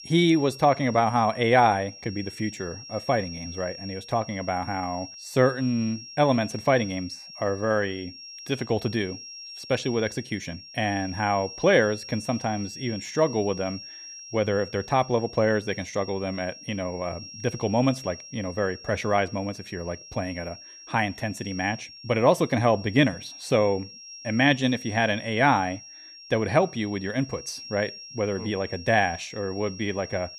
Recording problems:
high-pitched whine; noticeable; throughout; 5.5 kHz, 15 dB below the speech

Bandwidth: 14 kHz